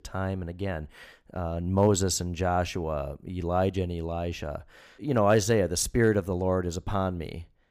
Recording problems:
none

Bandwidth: 15 kHz